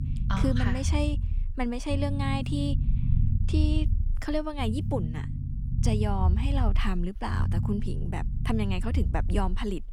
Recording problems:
low rumble; loud; throughout; 10 dB below the speech

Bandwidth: 18.5 kHz